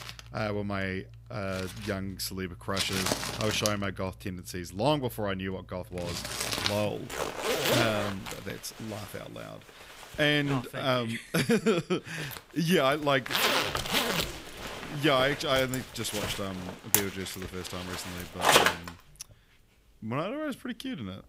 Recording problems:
household noises; very loud; throughout; 1 dB above the speech

